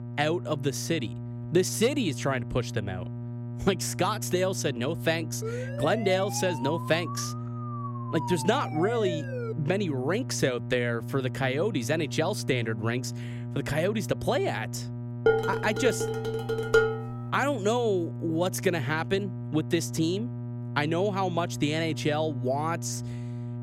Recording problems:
electrical hum; noticeable; throughout; 60 Hz, 15 dB below the speech
siren; noticeable; from 5.5 to 9.5 s; peak 7 dB below the speech
clattering dishes; loud; from 15 to 17 s; peak 5 dB above the speech

